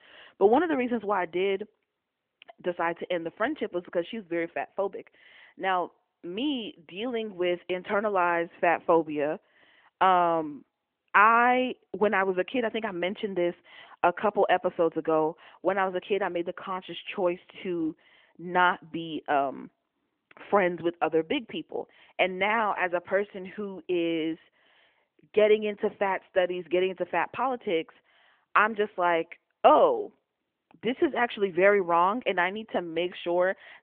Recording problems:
phone-call audio; nothing above 3 kHz

